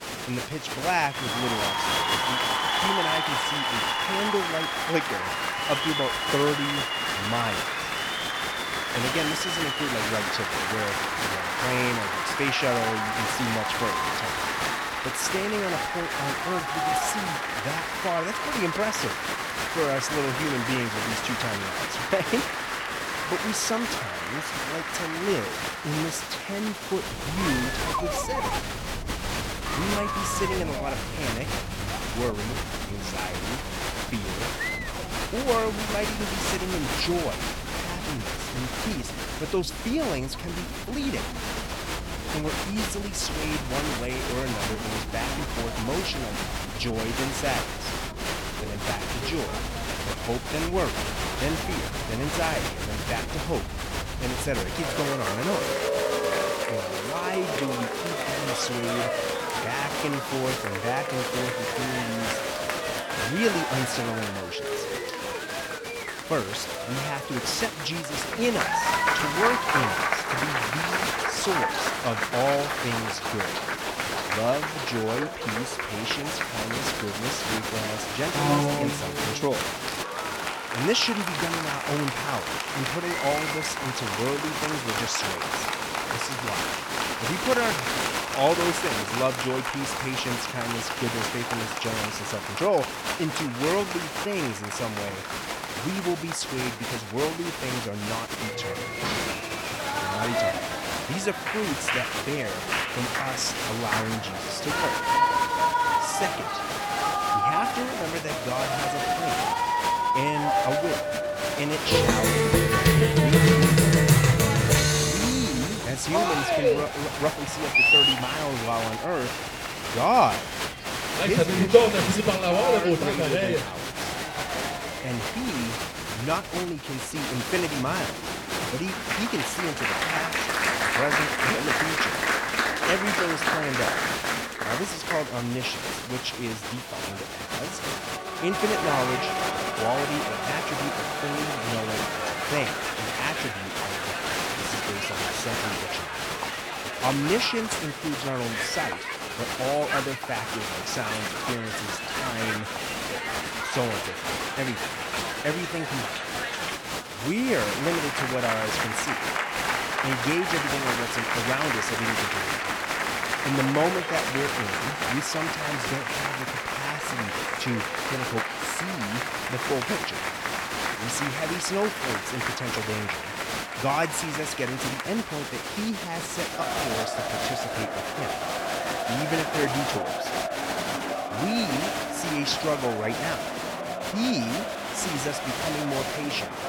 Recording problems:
crowd noise; very loud; throughout; 3 dB above the speech

